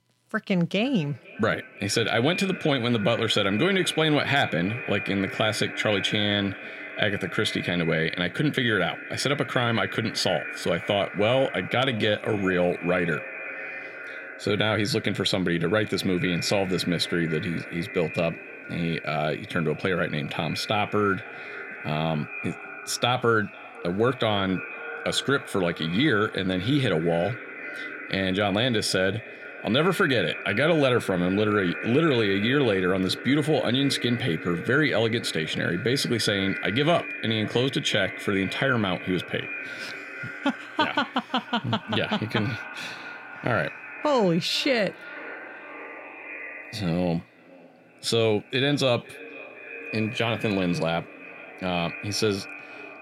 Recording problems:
echo of what is said; strong; throughout; 500 ms later, 10 dB below the speech

